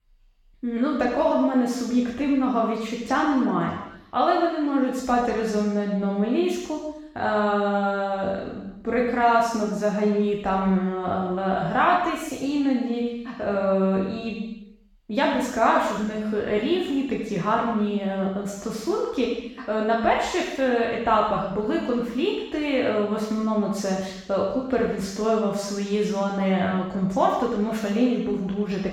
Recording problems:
room echo; strong; dies away in 0.9 s
off-mic speech; far

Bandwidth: 17.5 kHz